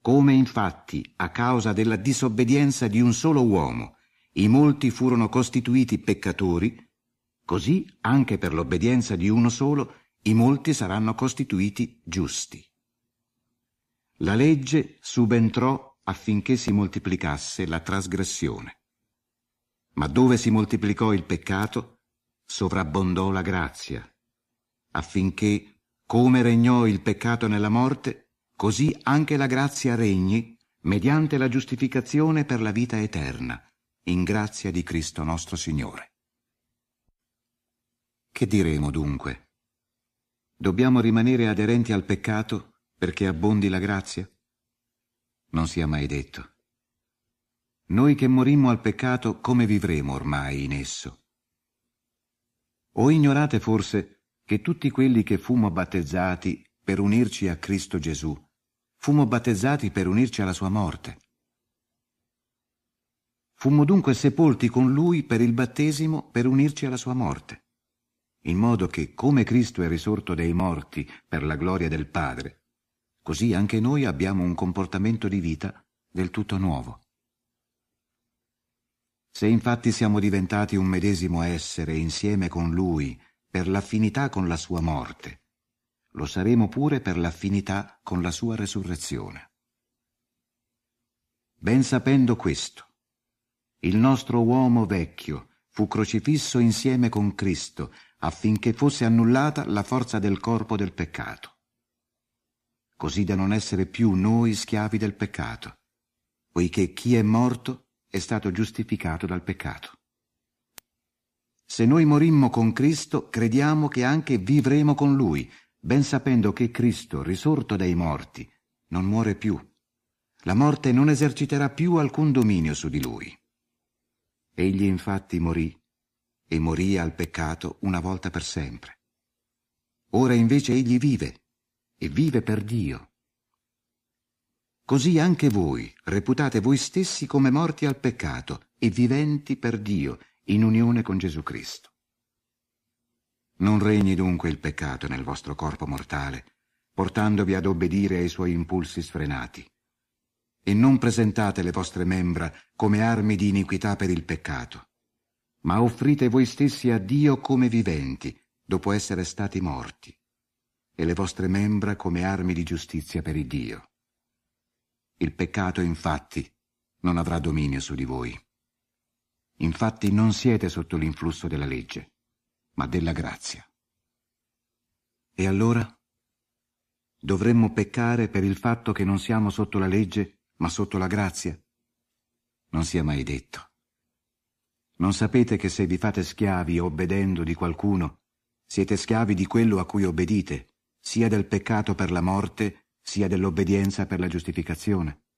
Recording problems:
none

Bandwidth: 15 kHz